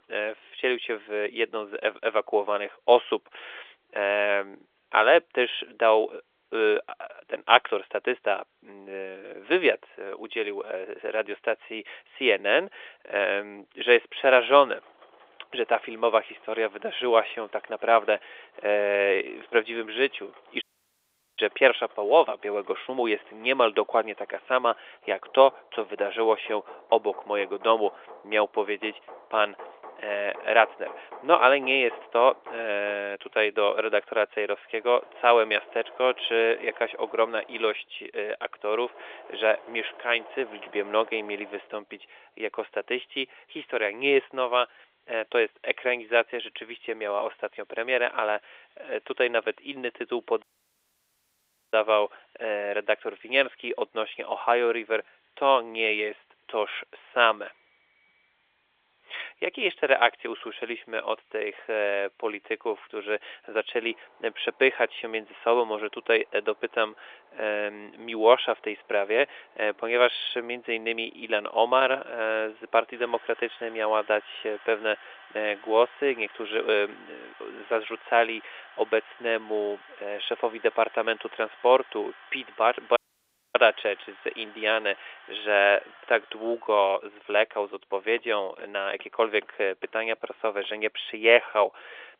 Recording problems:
phone-call audio; nothing above 3.5 kHz
machinery noise; faint; throughout; 25 dB below the speech
audio cutting out; at 21 s for 1 s, at 50 s for 1.5 s and at 1:23 for 0.5 s

